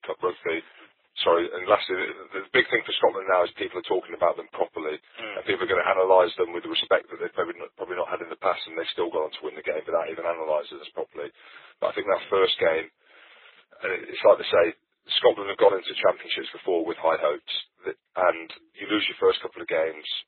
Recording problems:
garbled, watery; badly; nothing above 3.5 kHz
thin; very; fading below 350 Hz

